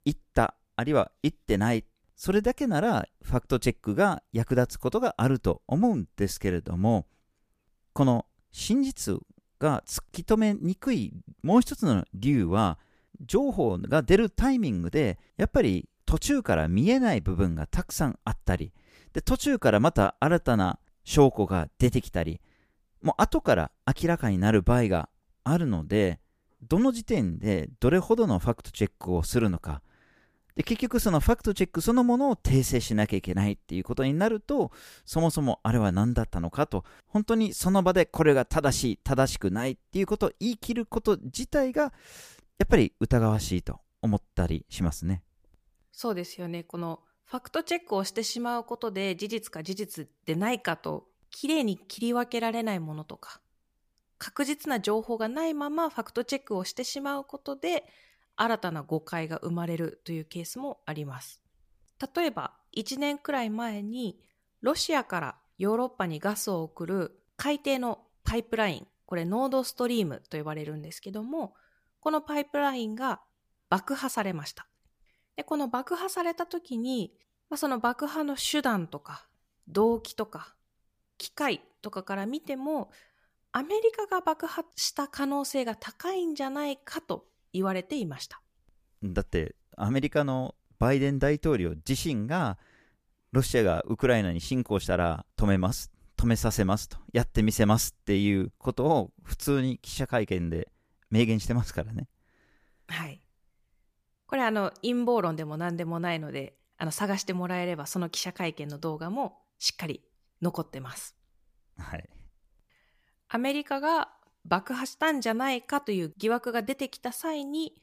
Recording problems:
none

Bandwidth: 15 kHz